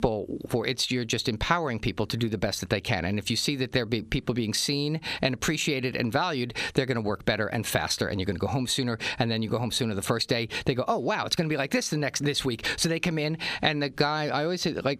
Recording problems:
squashed, flat; heavily

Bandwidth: 14.5 kHz